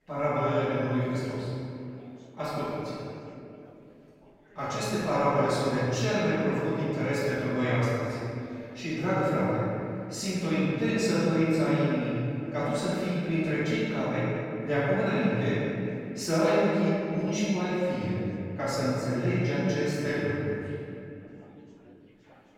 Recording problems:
room echo; strong; dies away in 2.7 s
off-mic speech; far
background chatter; faint; throughout; 4 voices, 30 dB below the speech

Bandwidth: 16.5 kHz